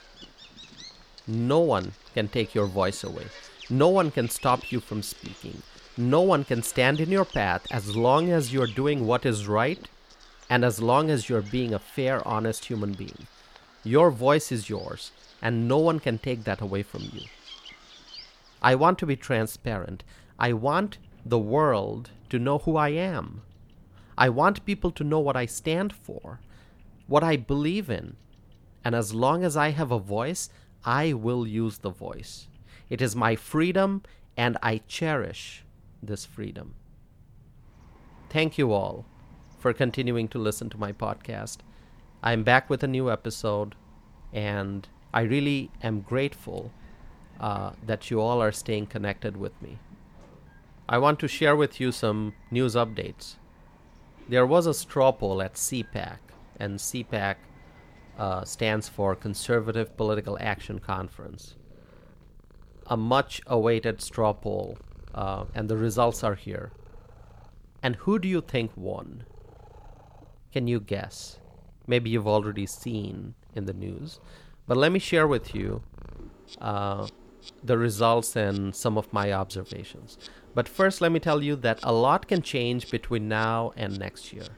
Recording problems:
animal sounds; faint; throughout; 25 dB below the speech

